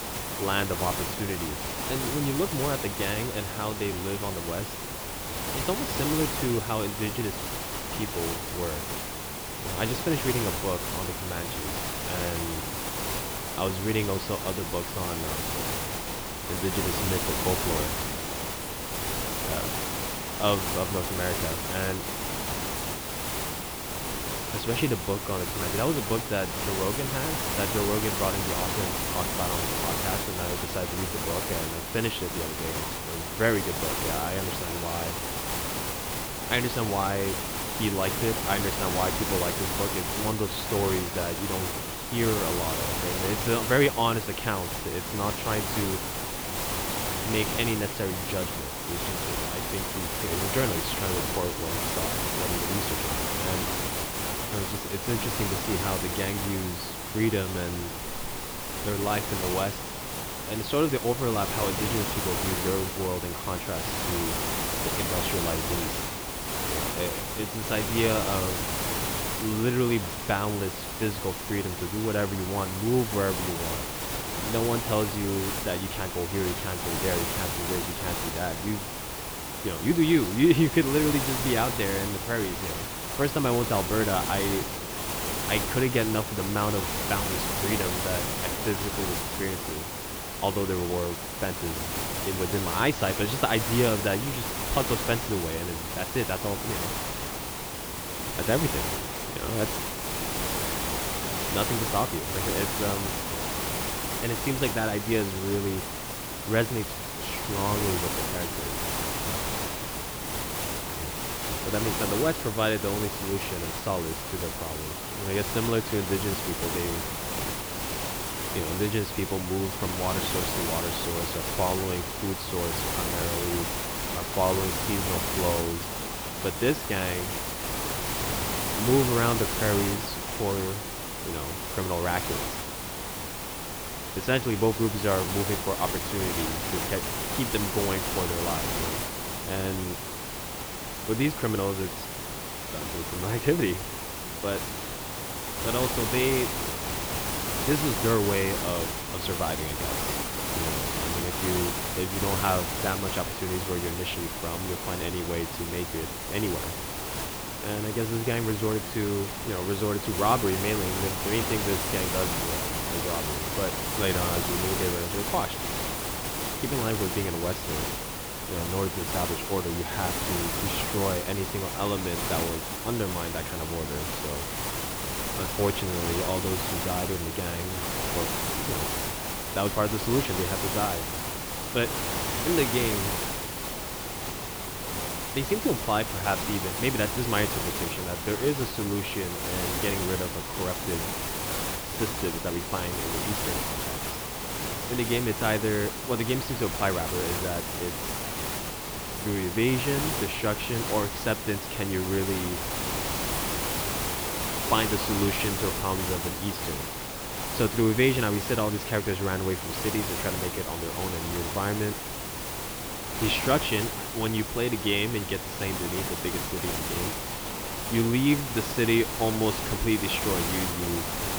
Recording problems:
muffled; slightly; fading above 3.5 kHz
hiss; loud; throughout; as loud as the speech

